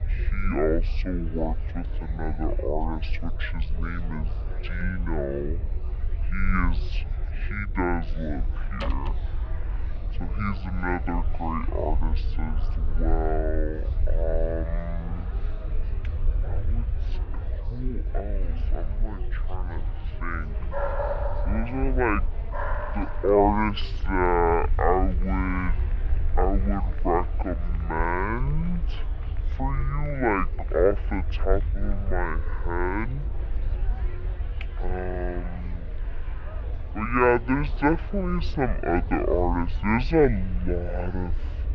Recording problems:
wrong speed and pitch; too slow and too low; 0.5 times normal speed
muffled; slightly; fading above 3.5 kHz
murmuring crowd; noticeable; throughout; 20 dB below the speech
low rumble; faint; throughout; 25 dB below the speech
door banging; noticeable; at 9 s; peak 10 dB below the speech
dog barking; noticeable; from 21 to 23 s; peak 1 dB below the speech

